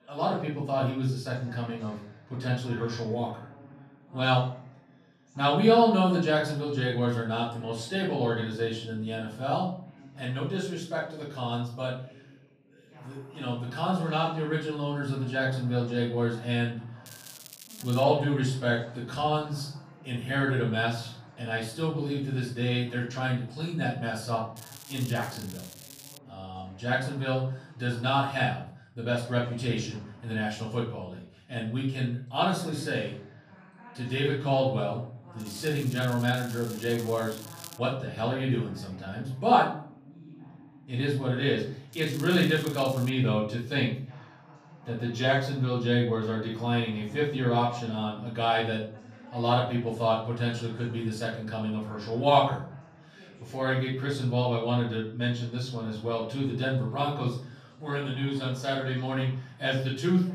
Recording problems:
off-mic speech; far
room echo; noticeable; dies away in 0.5 s
crackling; noticeable; 4 times, first at 17 s; 15 dB below the speech
background chatter; faint; throughout; 2 voices, 25 dB below the speech

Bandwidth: 15 kHz